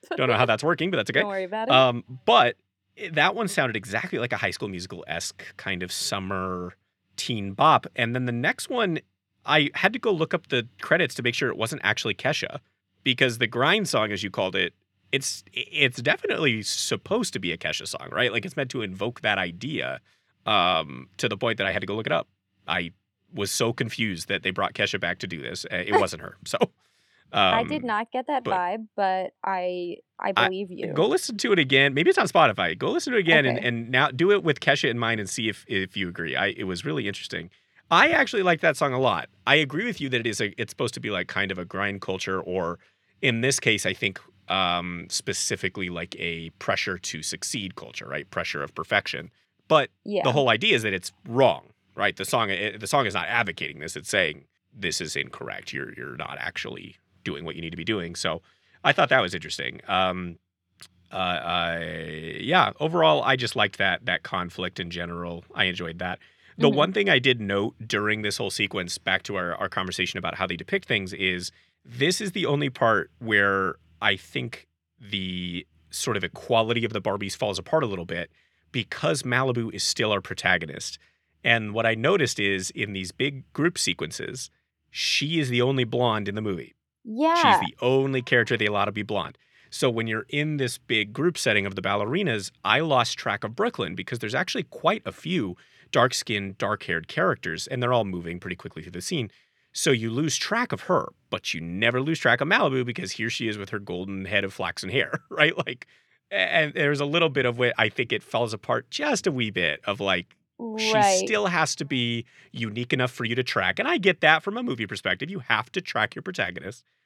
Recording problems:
none

